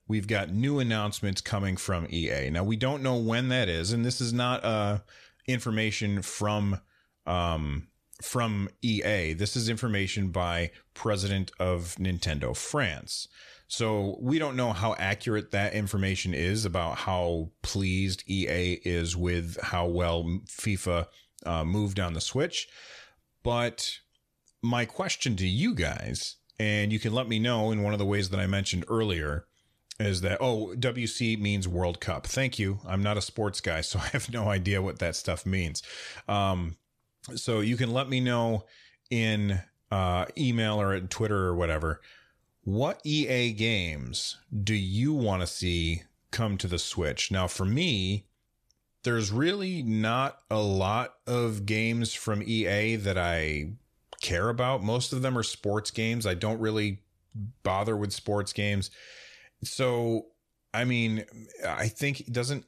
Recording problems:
none

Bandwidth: 14.5 kHz